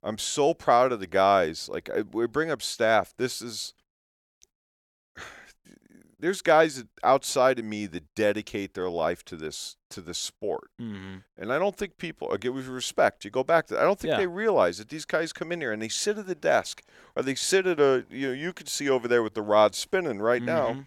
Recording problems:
none

